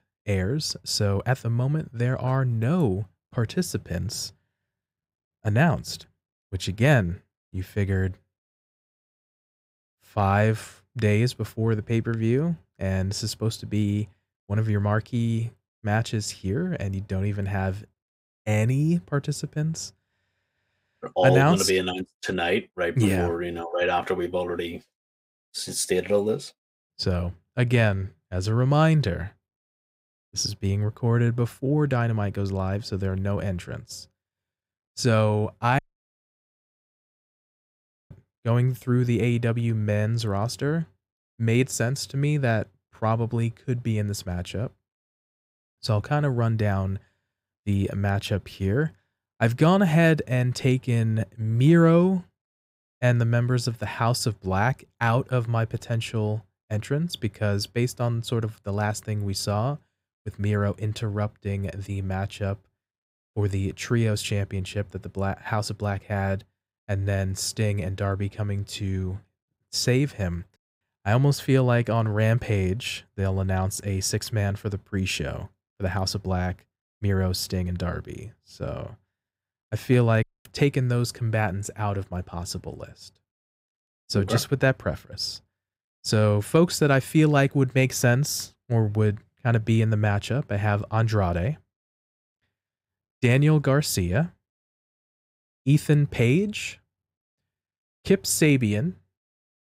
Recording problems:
audio cutting out; at 36 s for 2.5 s and at 1:20

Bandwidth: 15.5 kHz